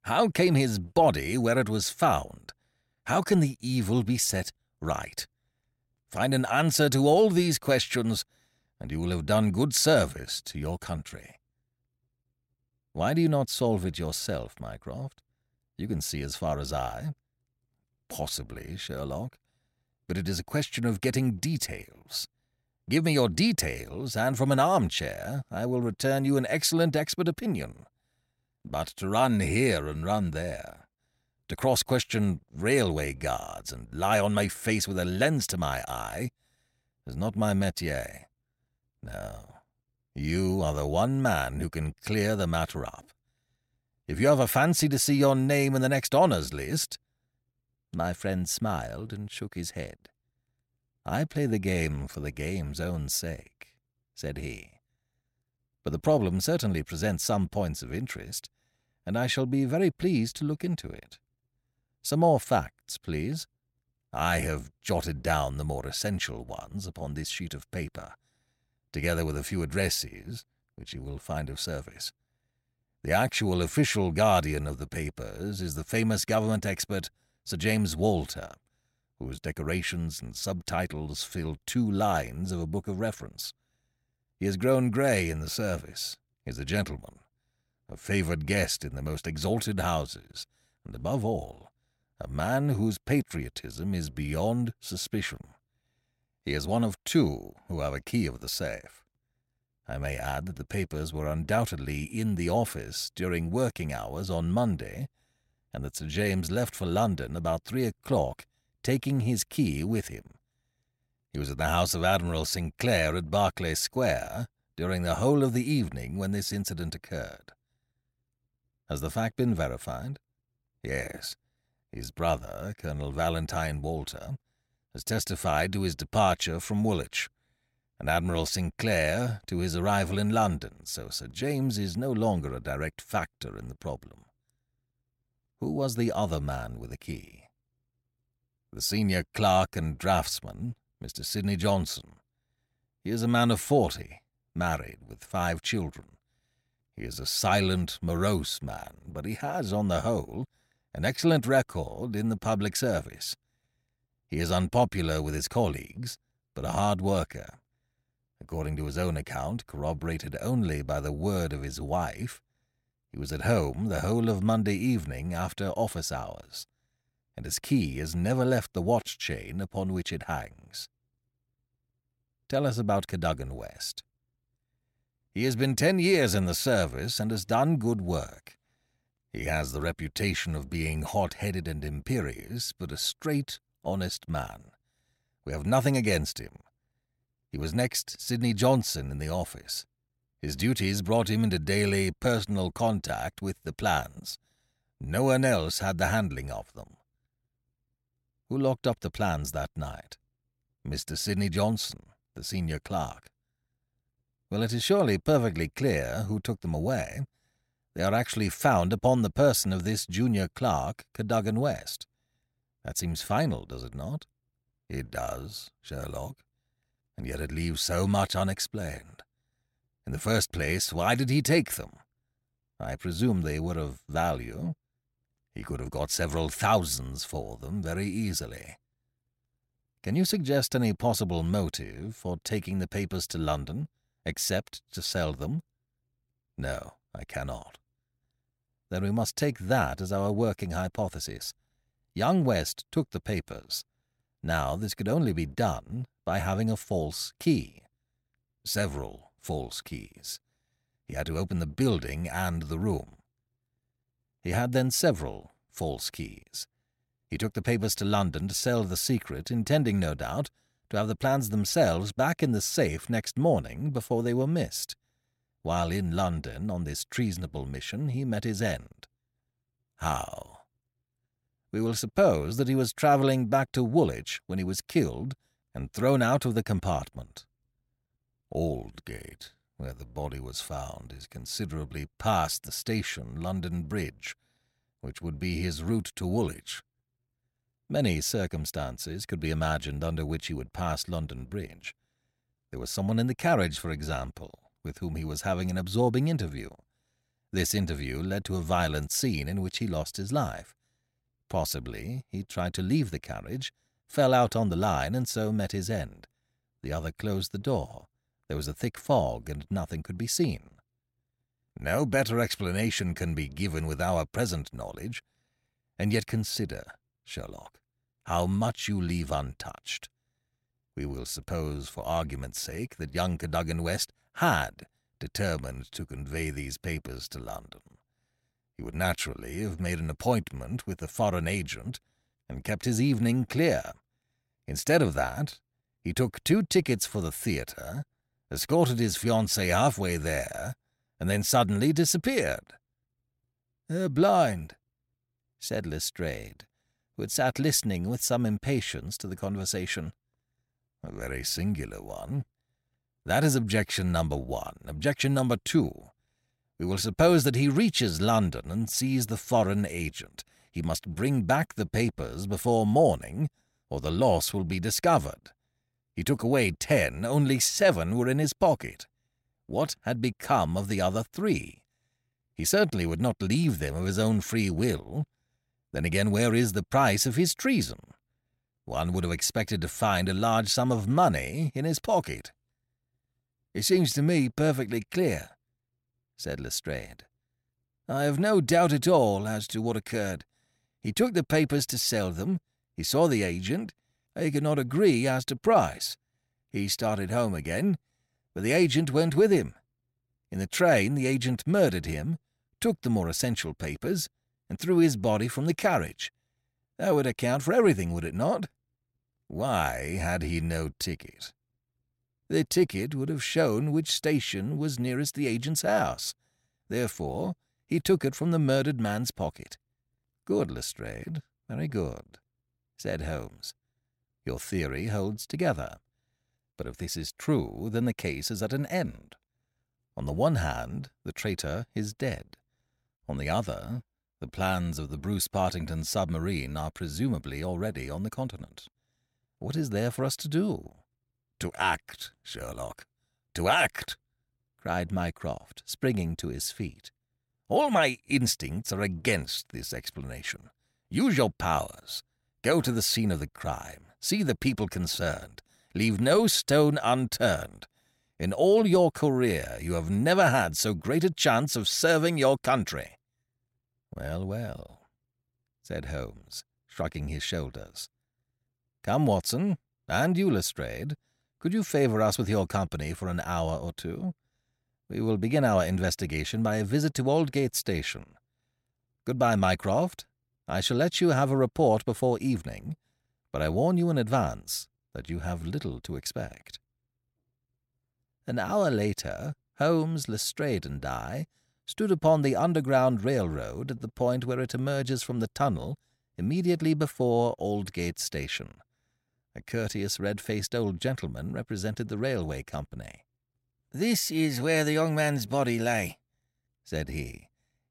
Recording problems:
none

